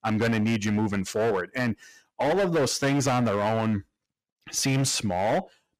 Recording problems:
distortion; heavy; 16% of the sound clipped

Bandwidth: 15 kHz